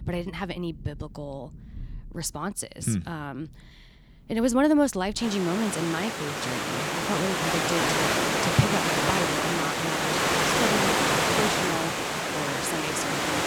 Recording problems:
rain or running water; very loud; throughout; 4 dB above the speech

